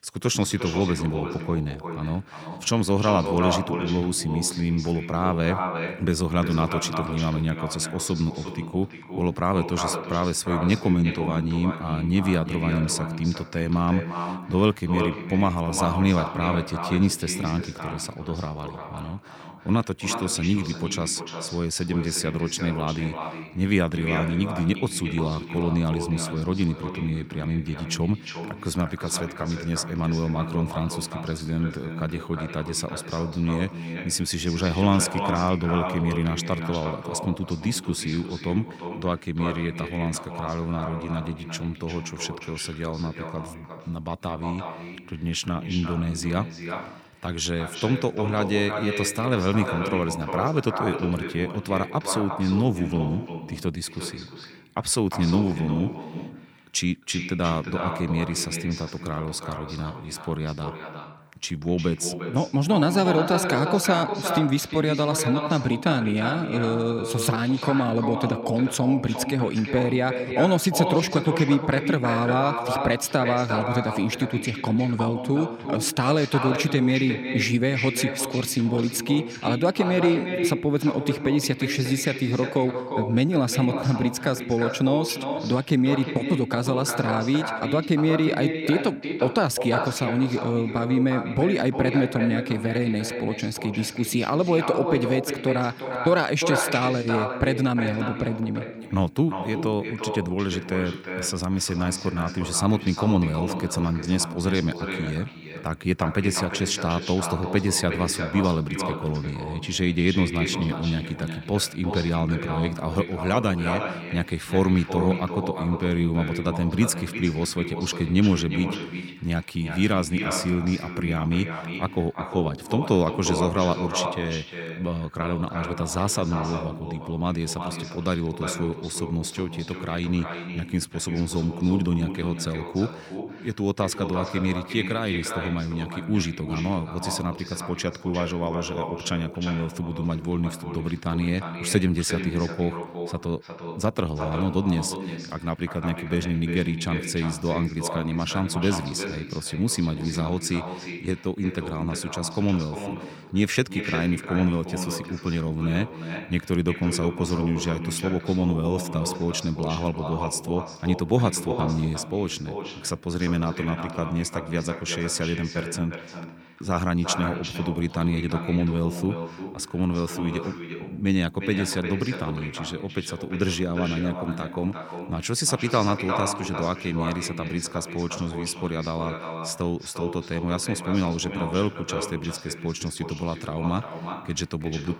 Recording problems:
echo of what is said; strong; throughout; 350 ms later, 7 dB below the speech

